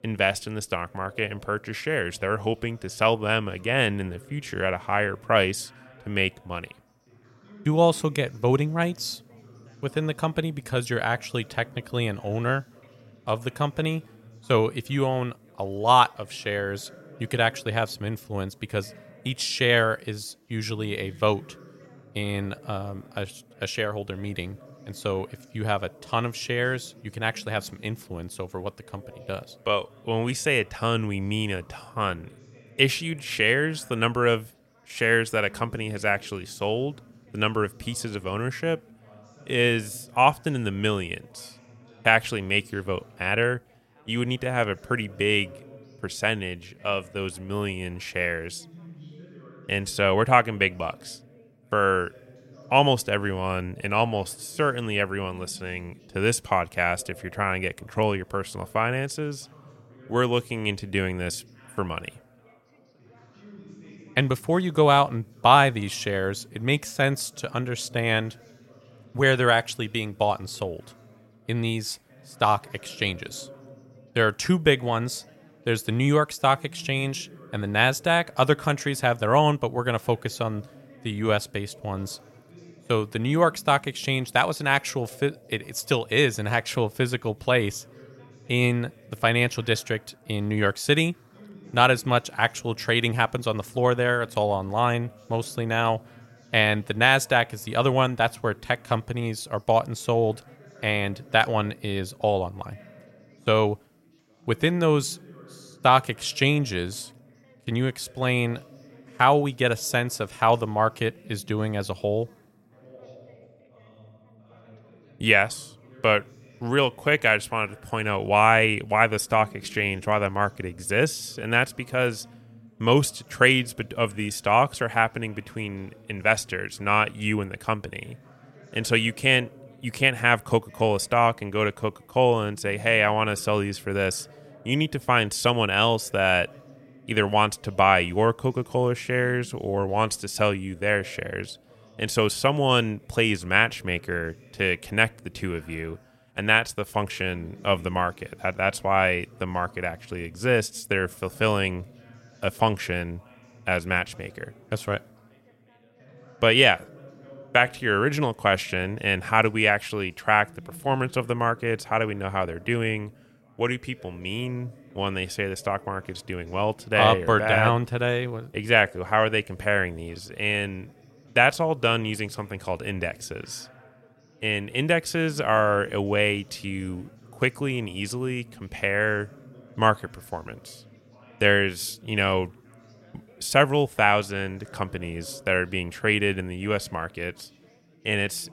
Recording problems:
background chatter; faint; throughout; 3 voices, 25 dB below the speech

